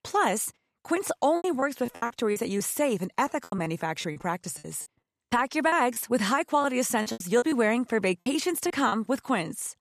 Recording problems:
choppy; very; 12% of the speech affected

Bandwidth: 14 kHz